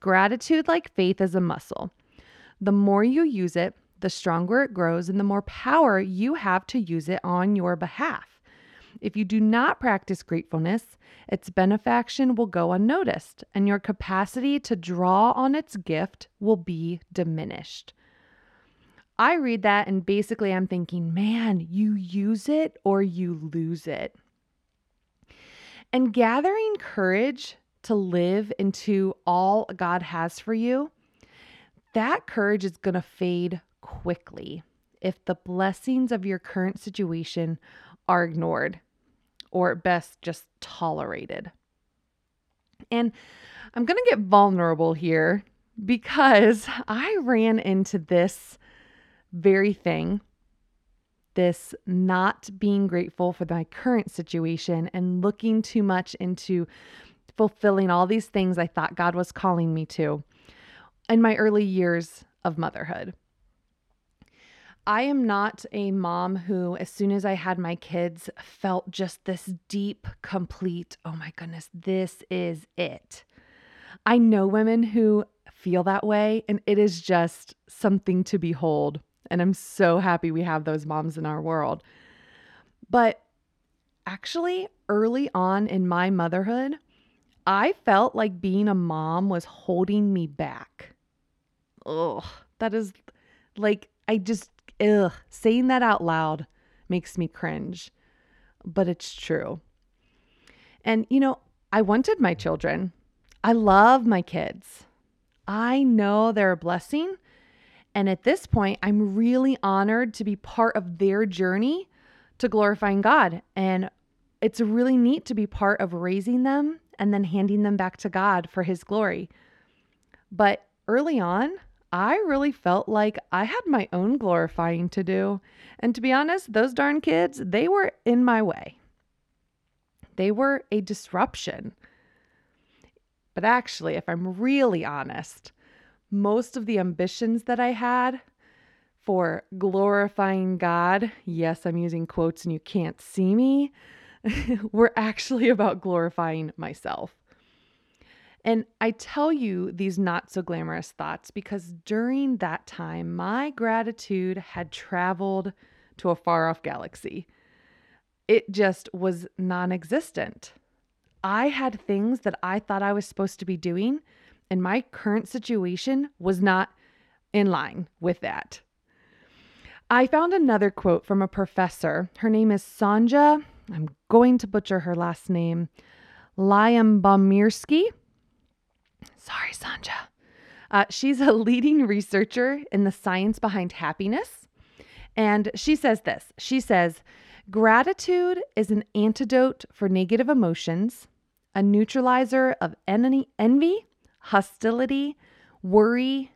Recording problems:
muffled; slightly; fading above 1.5 kHz

